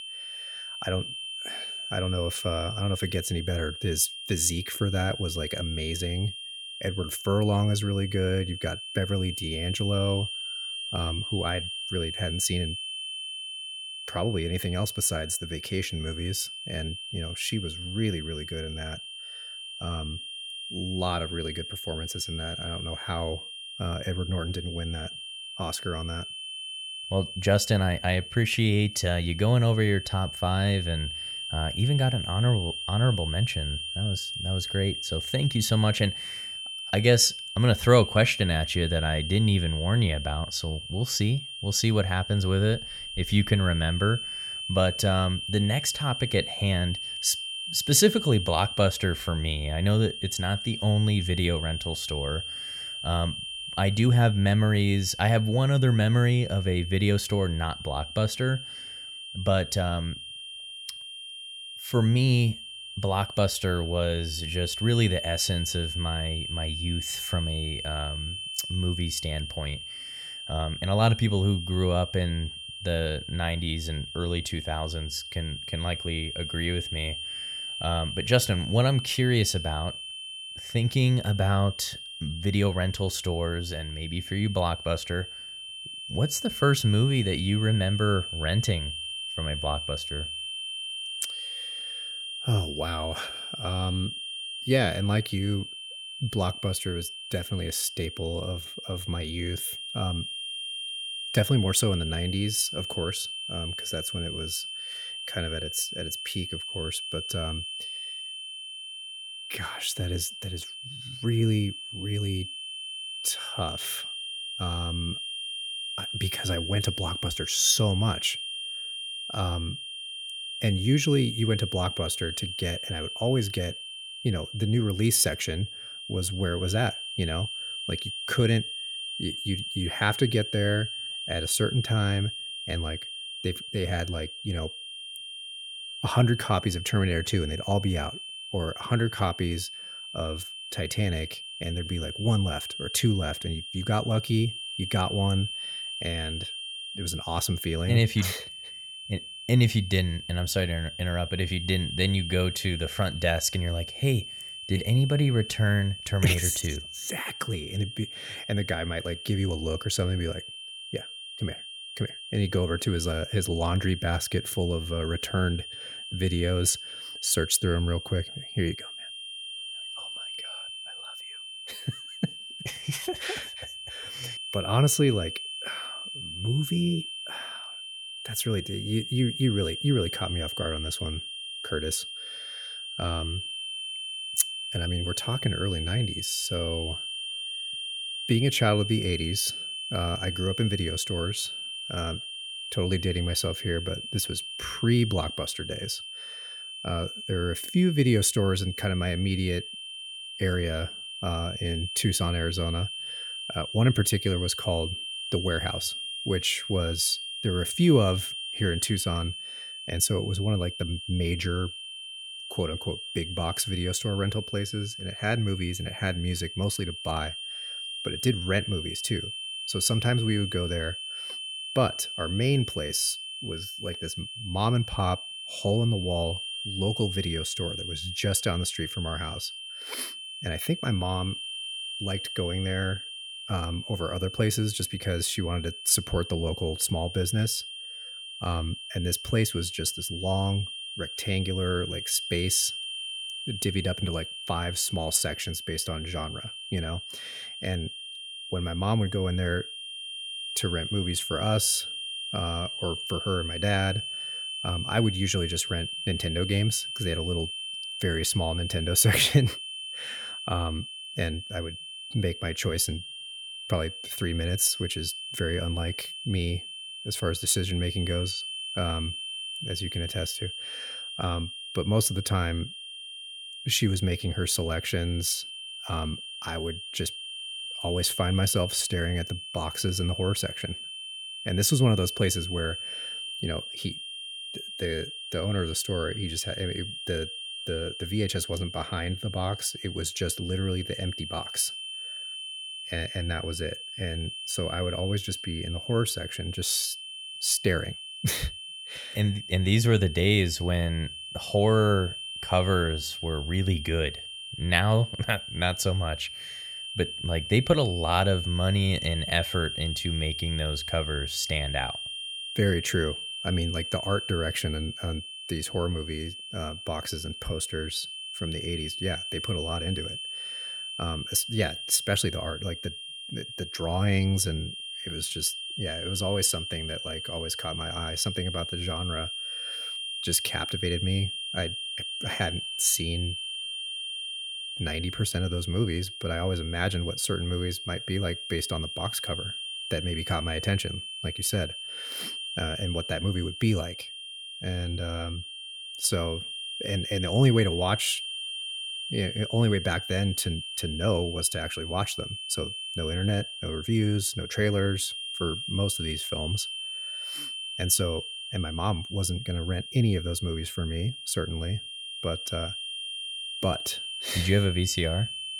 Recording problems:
high-pitched whine; loud; throughout; 3 kHz, 6 dB below the speech

